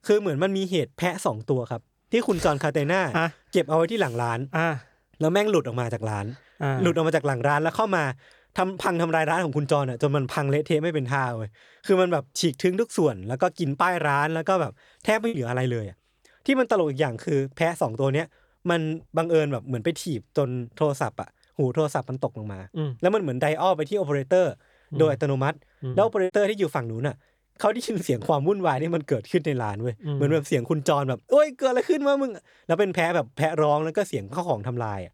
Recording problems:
choppy; occasionally; at 15 s and at 26 s; 3% of the speech affected

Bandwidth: 18.5 kHz